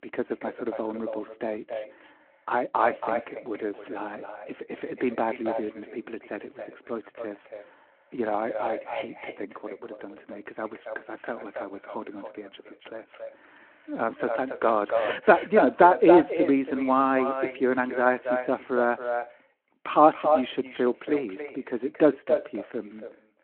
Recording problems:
echo of what is said; strong; throughout; 280 ms later, 6 dB below the speech
phone-call audio

